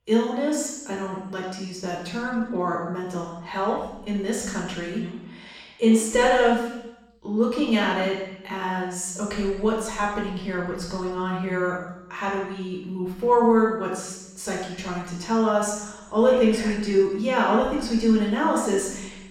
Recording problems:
off-mic speech; far
room echo; noticeable; dies away in 0.9 s

